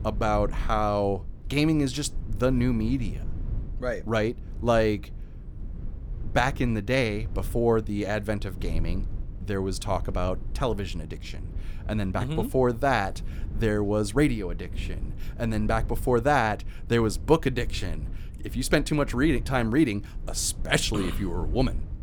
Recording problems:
low rumble; faint; throughout; 25 dB below the speech

